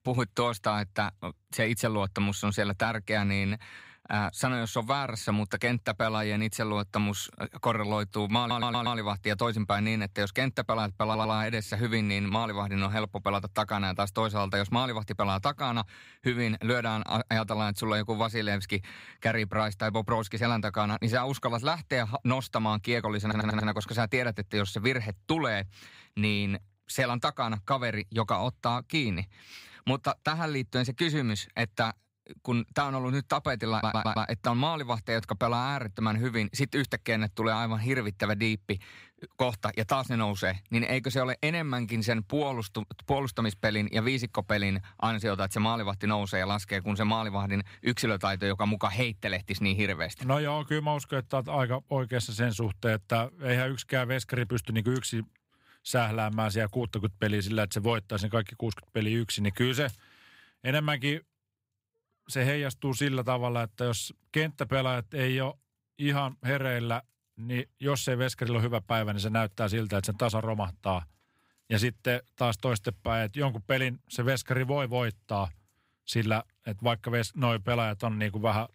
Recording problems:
audio stuttering; 4 times, first at 8.5 s

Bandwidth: 15.5 kHz